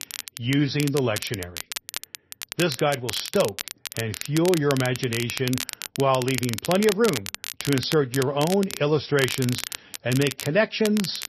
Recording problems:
garbled, watery; slightly; nothing above 5.5 kHz
crackle, like an old record; loud; 8 dB below the speech

